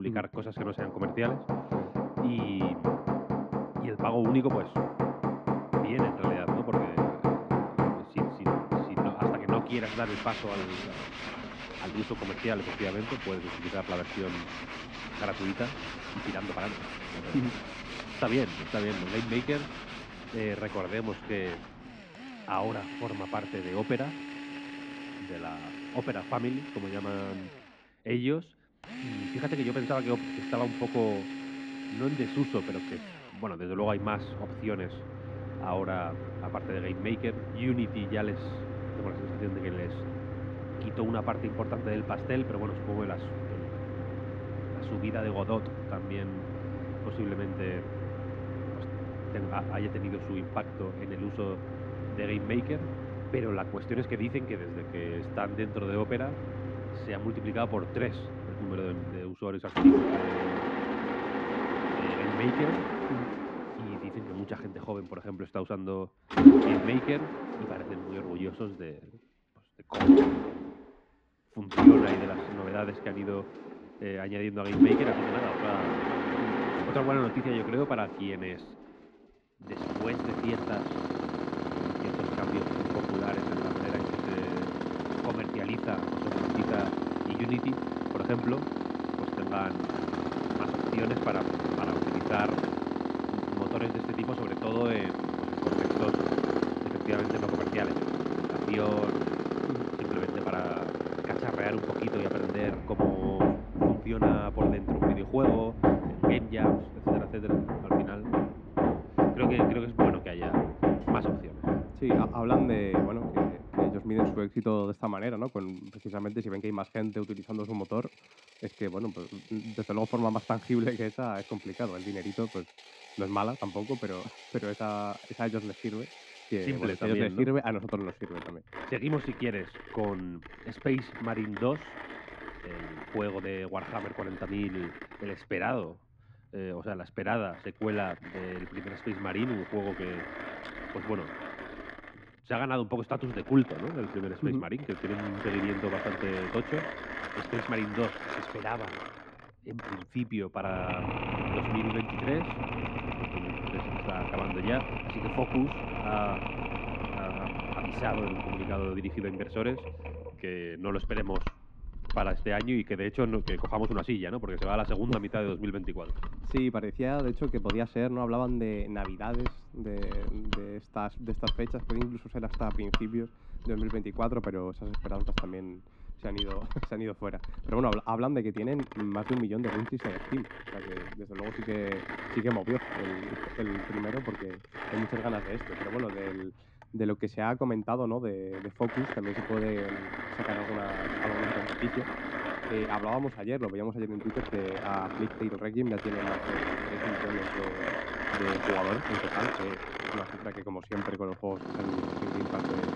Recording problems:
muffled; slightly; fading above 2.5 kHz
machinery noise; very loud; throughout; 2 dB above the speech
abrupt cut into speech; at the start

